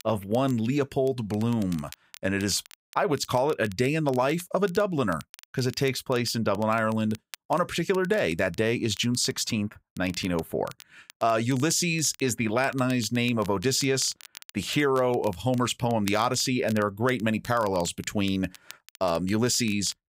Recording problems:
crackle, like an old record; faint; 20 dB below the speech

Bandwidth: 15.5 kHz